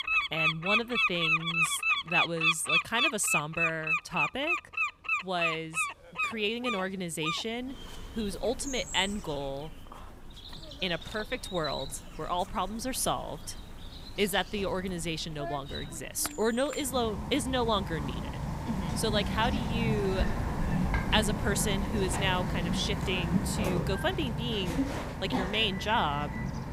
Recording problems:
animal sounds; very loud; throughout; 1 dB above the speech

